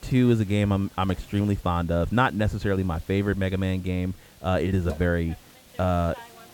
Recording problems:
muffled; slightly; fading above 2.5 kHz
hiss; faint; throughout; 25 dB below the speech

